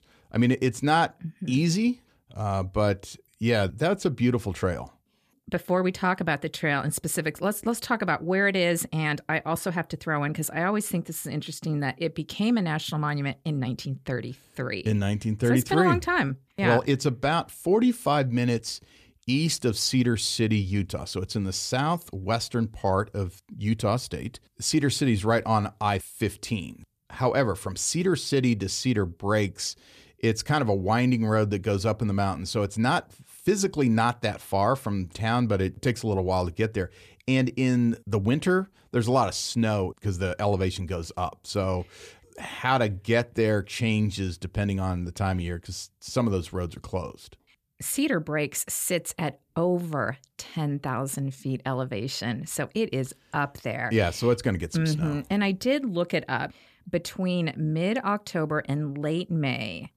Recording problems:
none

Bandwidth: 14.5 kHz